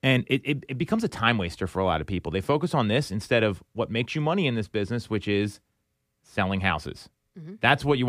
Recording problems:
abrupt cut into speech; at the end

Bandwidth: 15 kHz